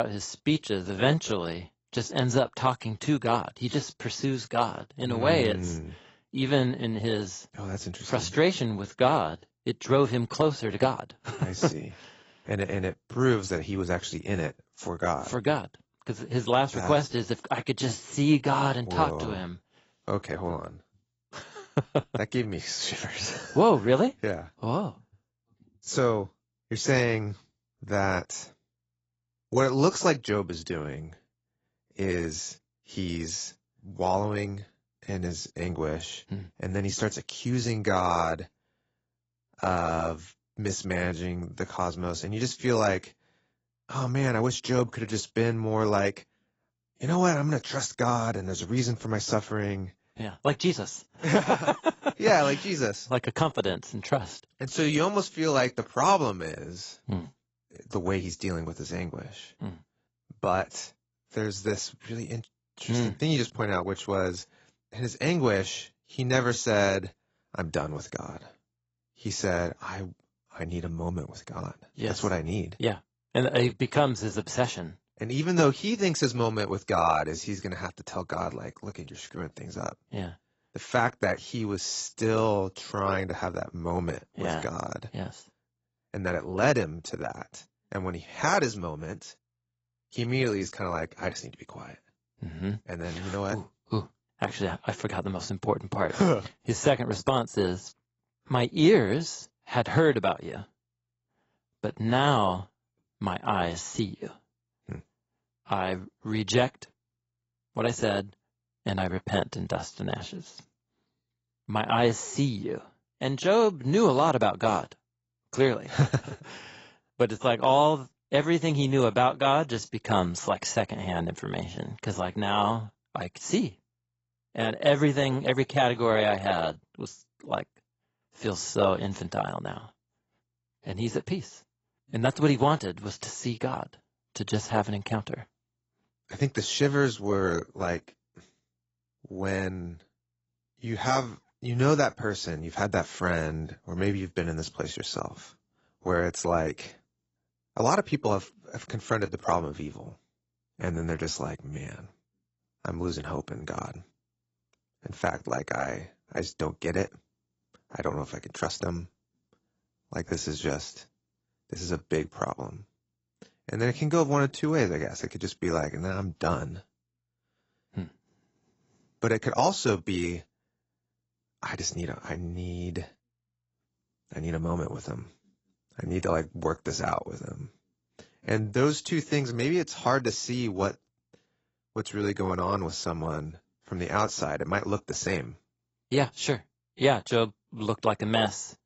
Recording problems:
garbled, watery; badly; nothing above 7.5 kHz
abrupt cut into speech; at the start

